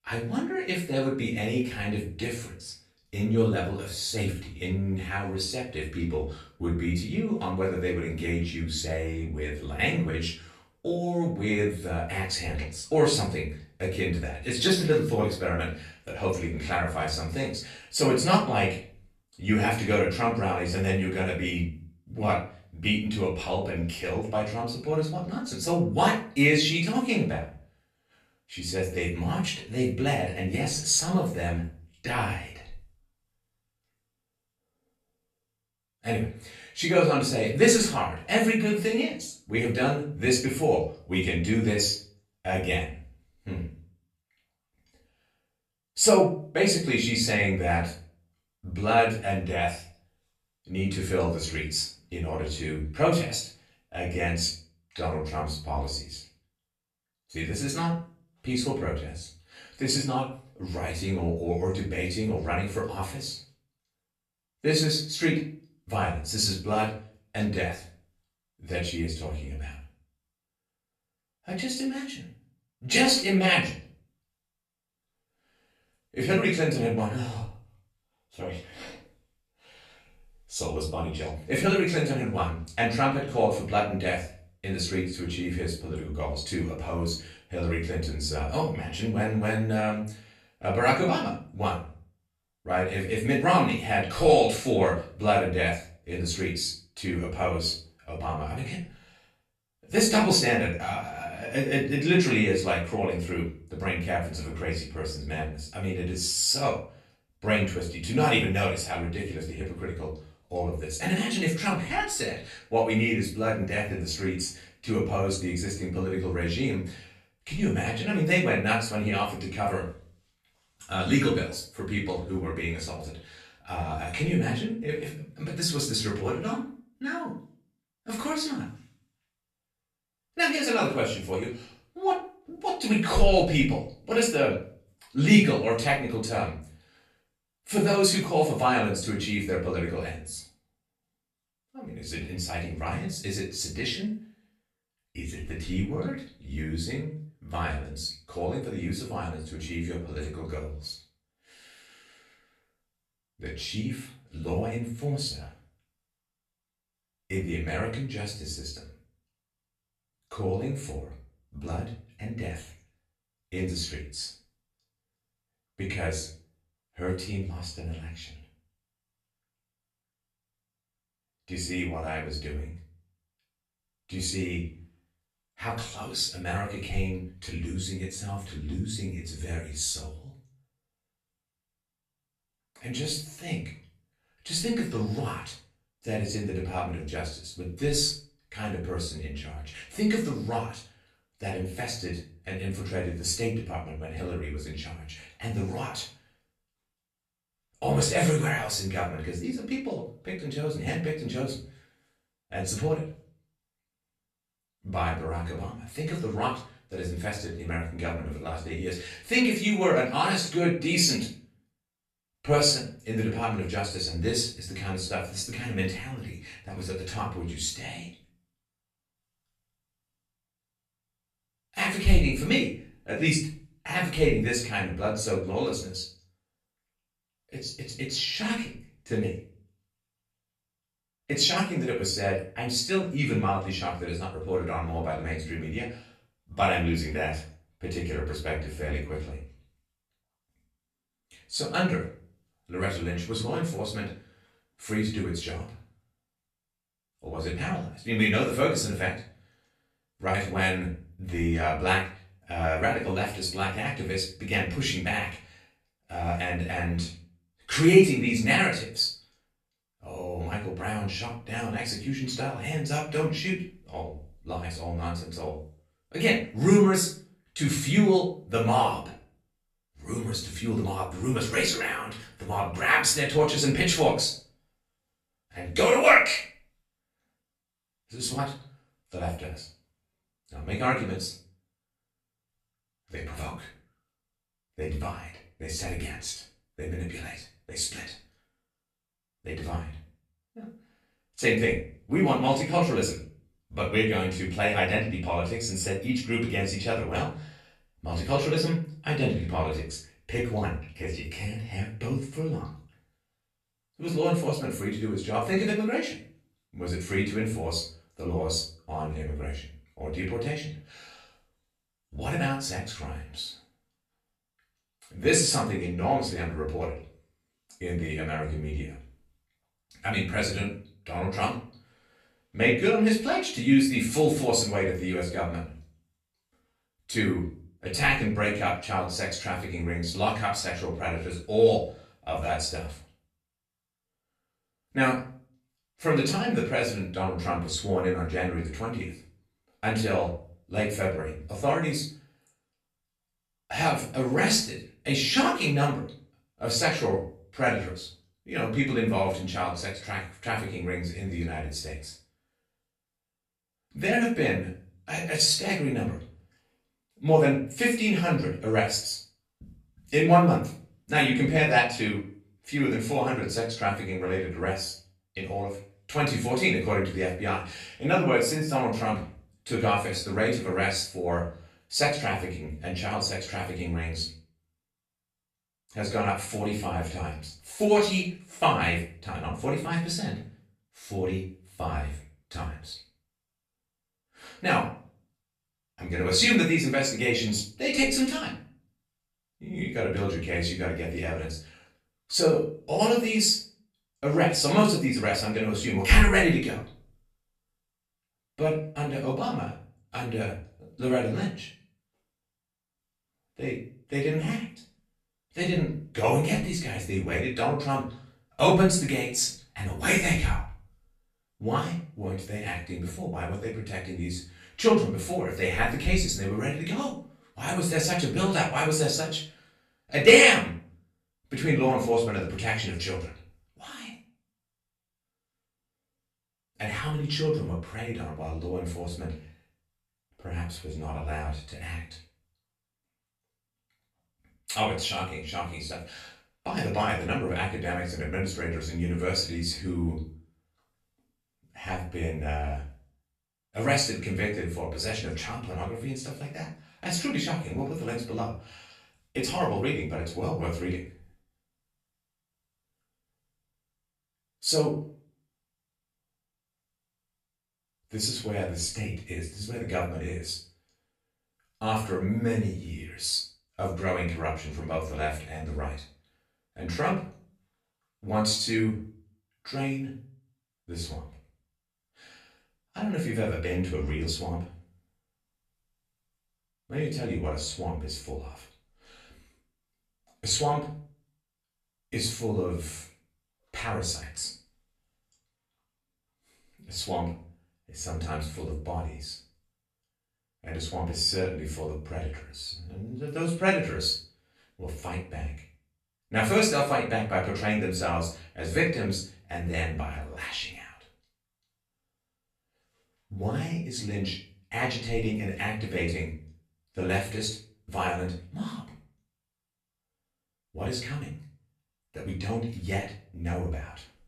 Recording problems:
off-mic speech; far
room echo; slight; dies away in 0.4 s

